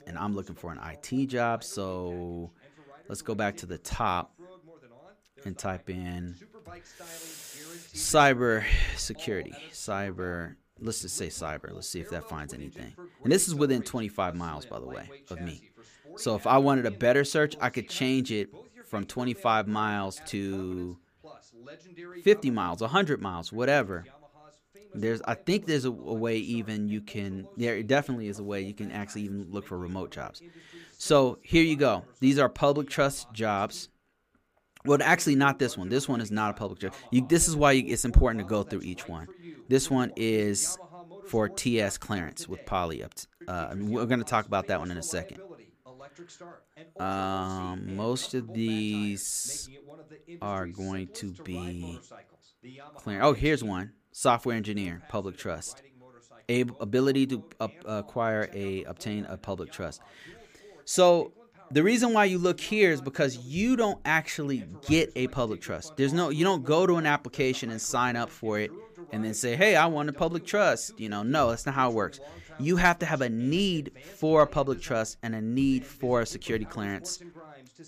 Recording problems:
voice in the background; faint; throughout; 25 dB below the speech

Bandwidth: 15 kHz